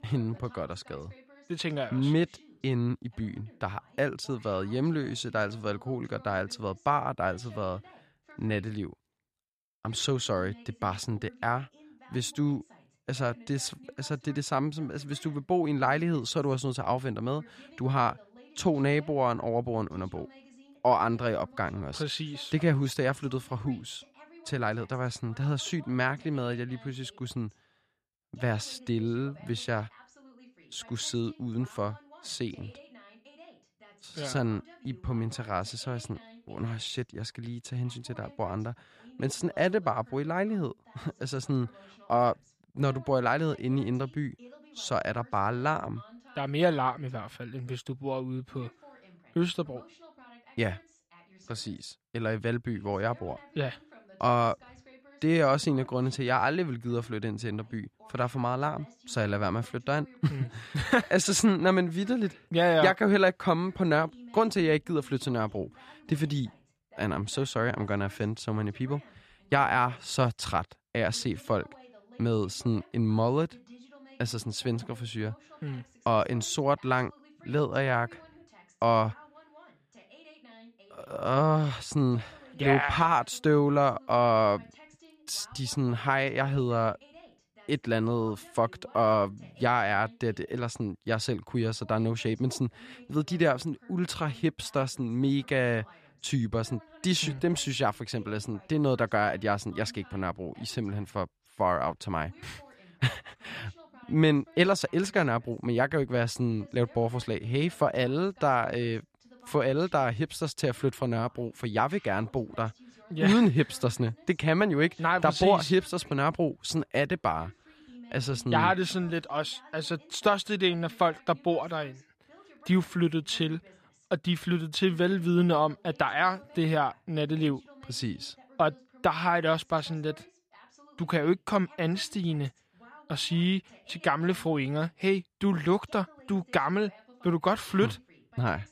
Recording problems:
voice in the background; faint; throughout; 25 dB below the speech

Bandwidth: 14.5 kHz